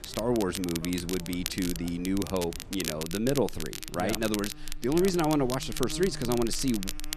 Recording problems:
crackle, like an old record; loud; 8 dB below the speech
animal sounds; noticeable; throughout; 15 dB below the speech

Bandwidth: 14 kHz